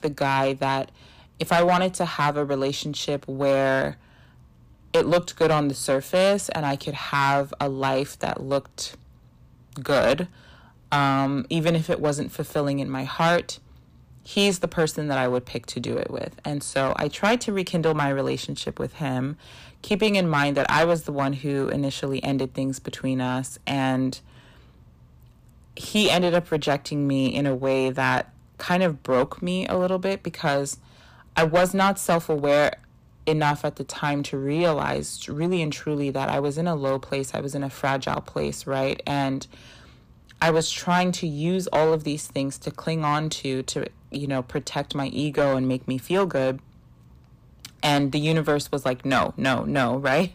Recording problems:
distortion; slight; 5% of the sound clipped

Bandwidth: 15 kHz